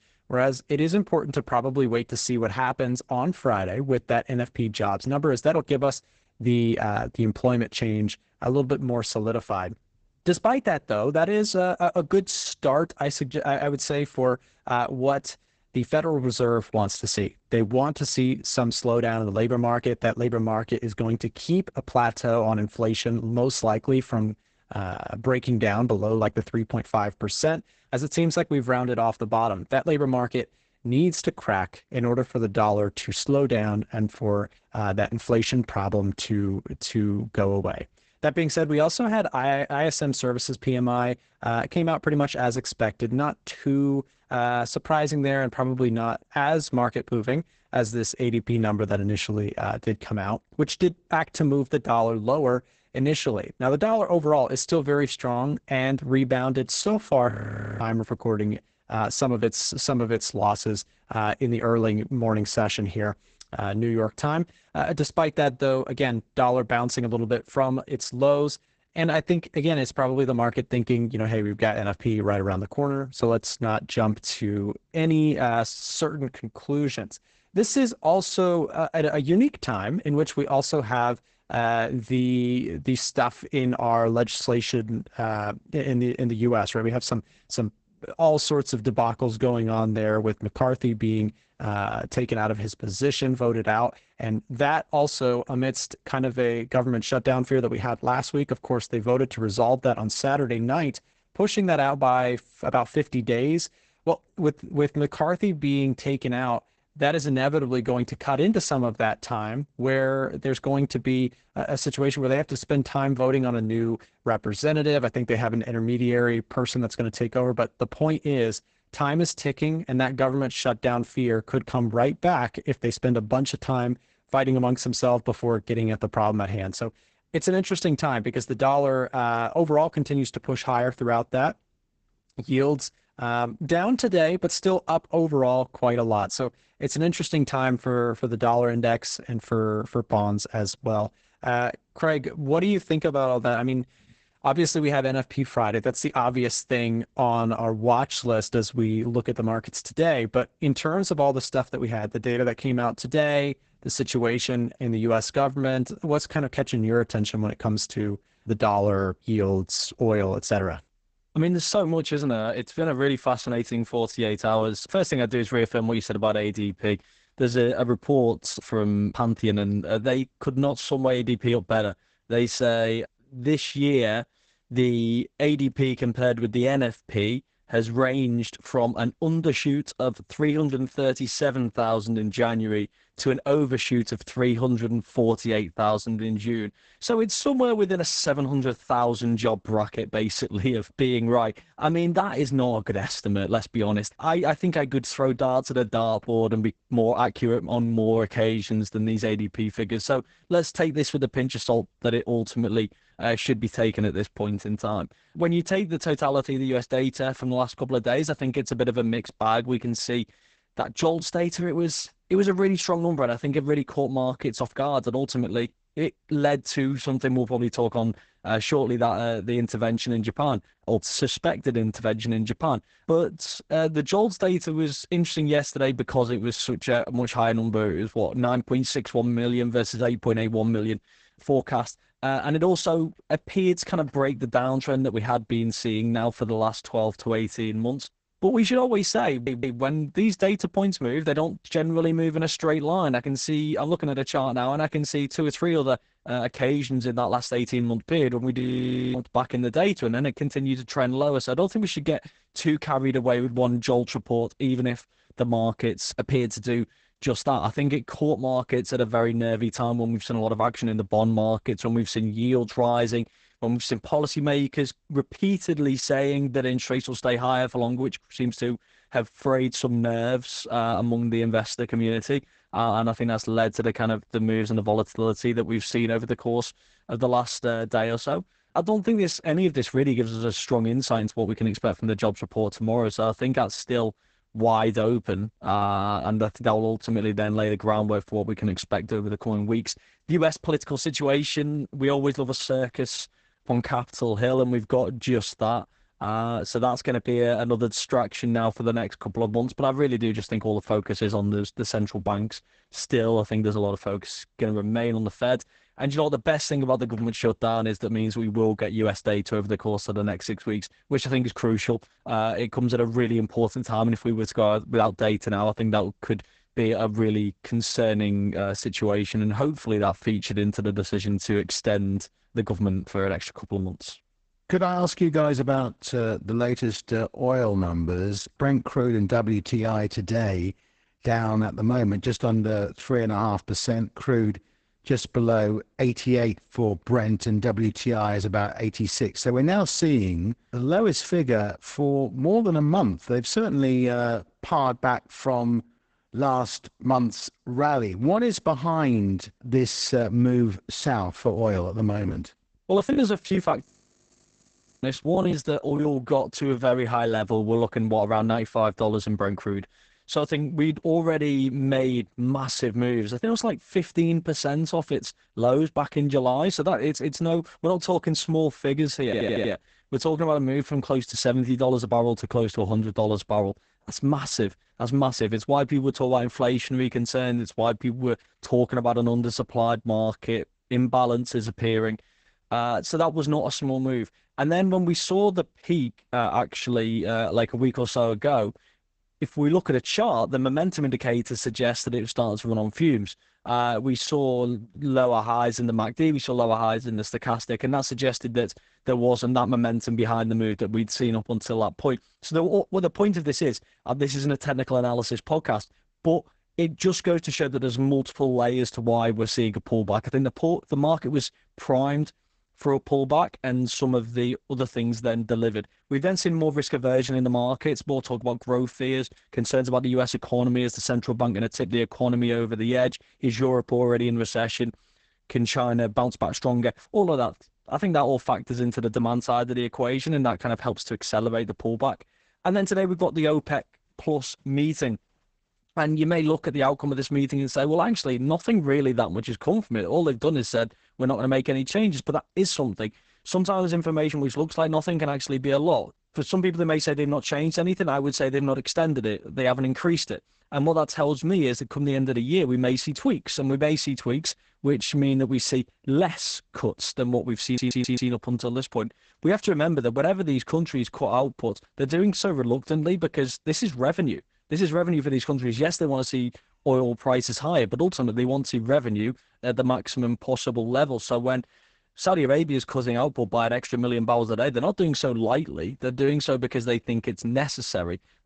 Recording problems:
garbled, watery; badly; nothing above 8 kHz
audio freezing; at 57 s, at 4:09 for 0.5 s and at 5:54 for 1 s
audio stuttering; at 3:59, at 6:09 and at 7:38
choppy; very; from 5:52 to 5:56; 17% of the speech affected

